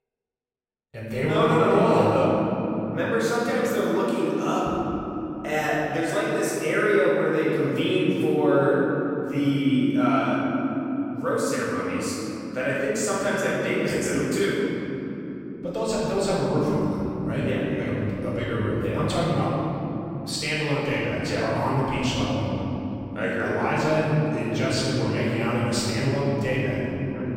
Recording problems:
room echo; strong; dies away in 3 s
off-mic speech; far

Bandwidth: 16 kHz